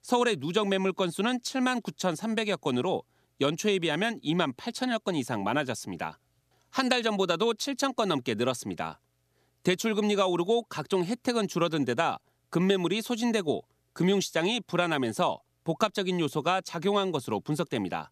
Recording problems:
none

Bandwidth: 14.5 kHz